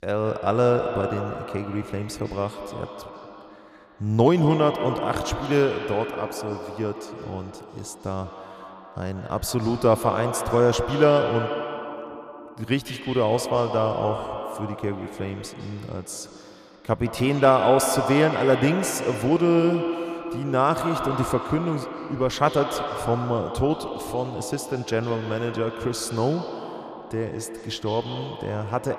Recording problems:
echo of what is said; strong; throughout; 150 ms later, 7 dB below the speech

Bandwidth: 14.5 kHz